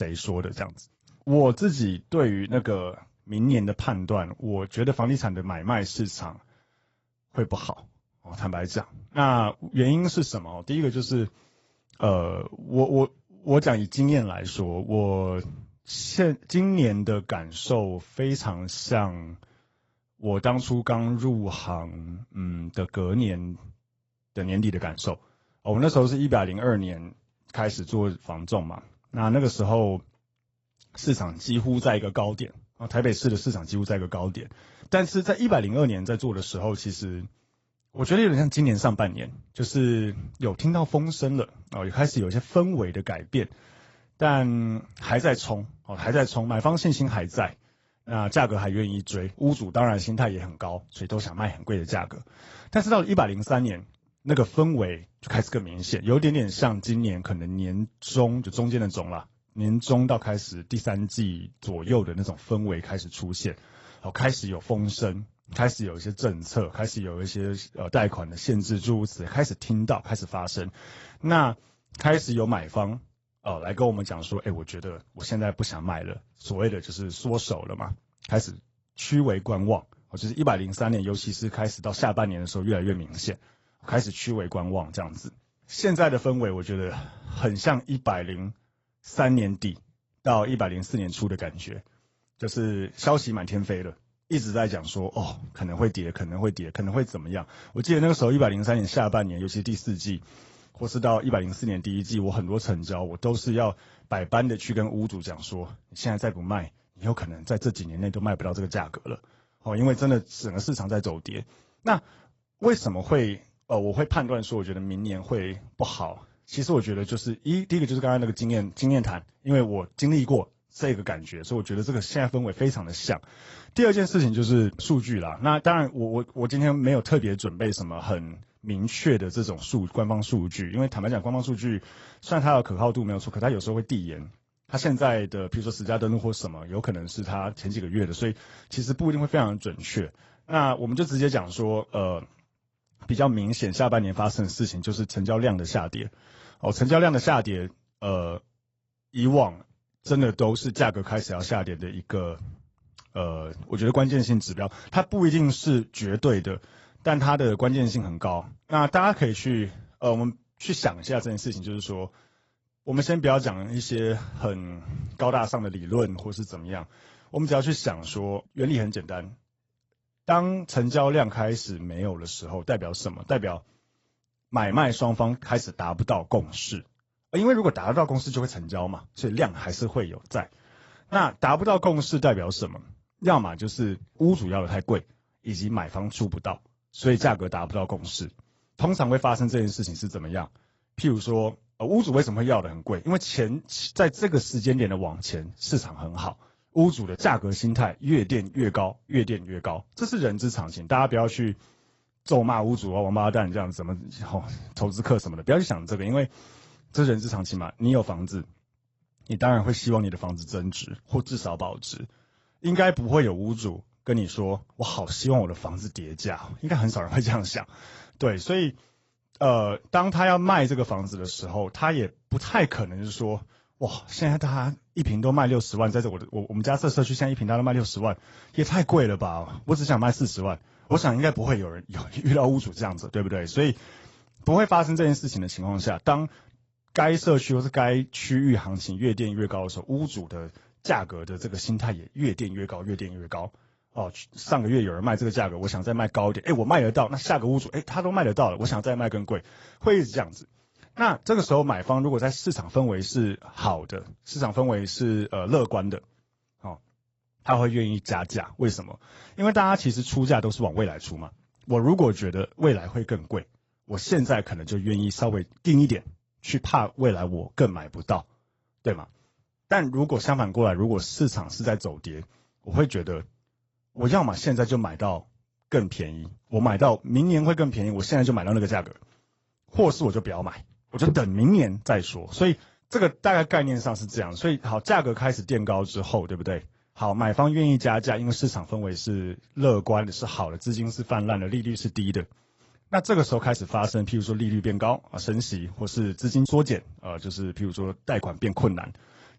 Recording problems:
garbled, watery; badly; nothing above 8 kHz
abrupt cut into speech; at the start

